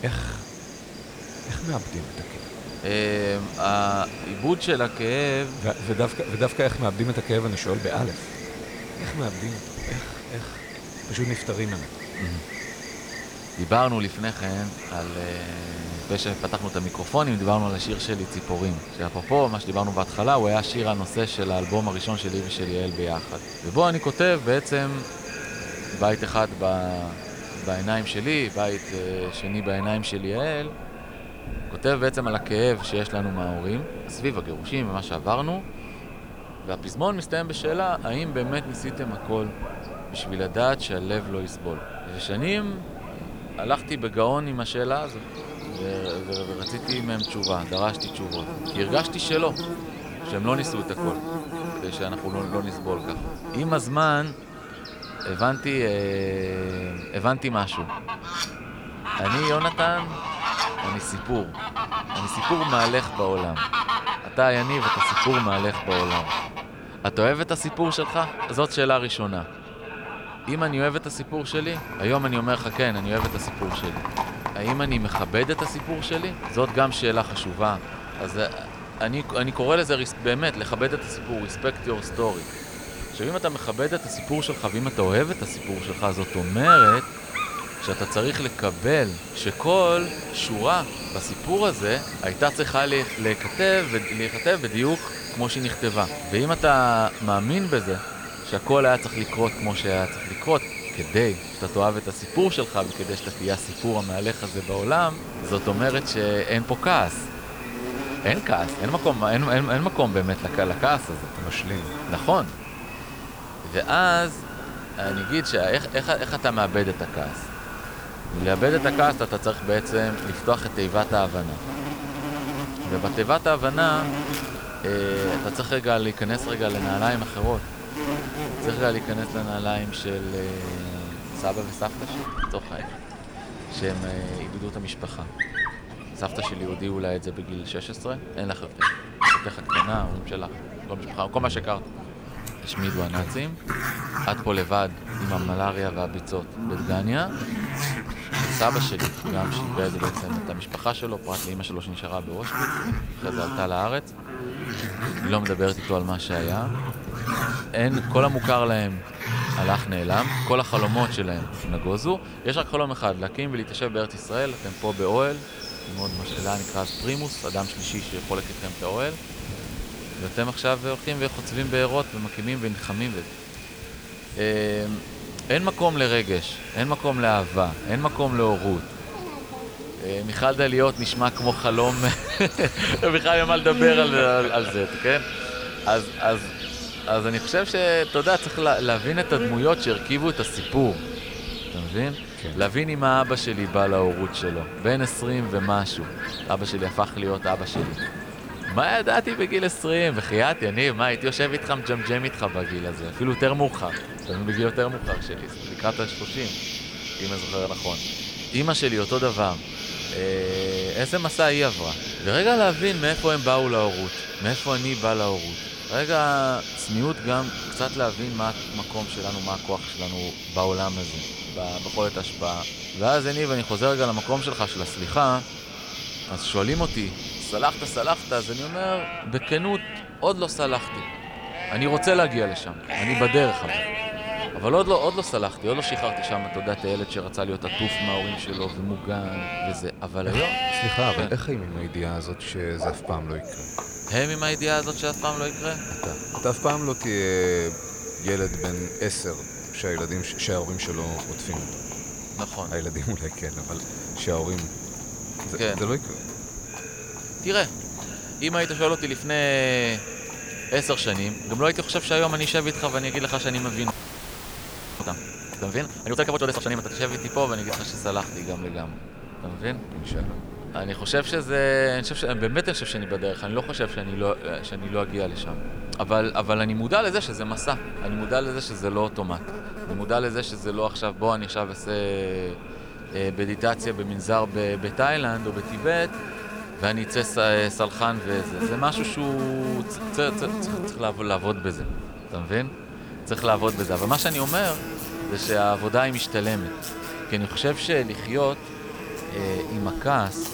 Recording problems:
echo of what is said; noticeable; throughout; 520 ms later, 15 dB below the speech
animal sounds; loud; throughout; 7 dB below the speech
hiss; noticeable; throughout; 15 dB below the speech
audio freezing; at 4:24 for 1 s

